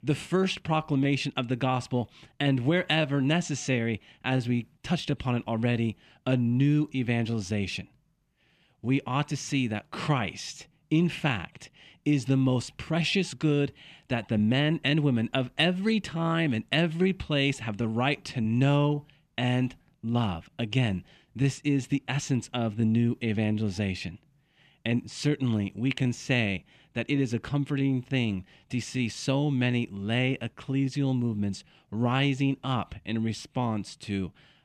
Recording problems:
none

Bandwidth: 14.5 kHz